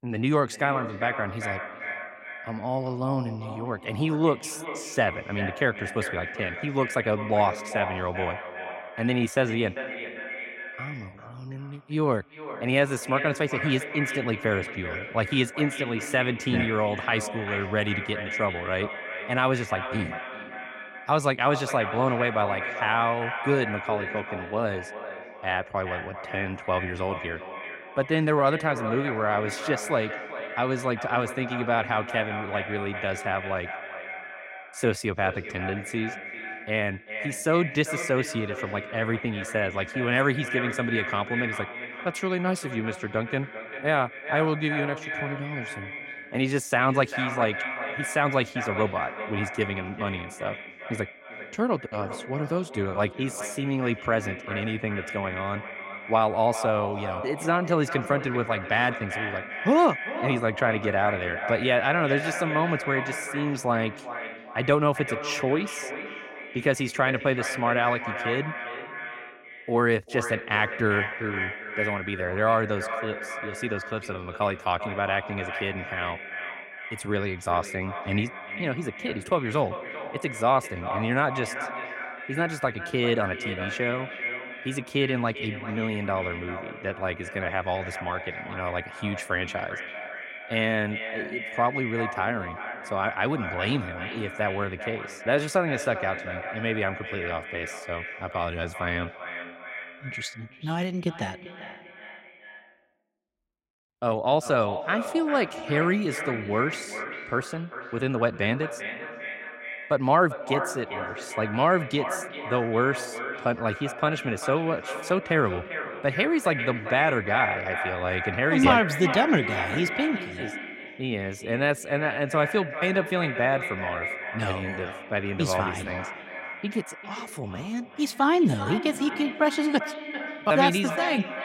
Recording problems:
echo of what is said; strong; throughout; 390 ms later, 7 dB below the speech

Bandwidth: 16 kHz